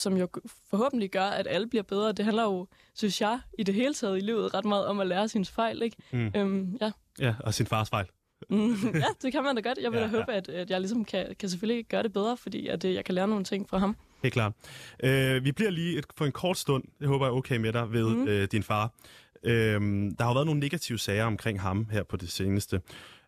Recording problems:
abrupt cut into speech; at the start

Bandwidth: 14.5 kHz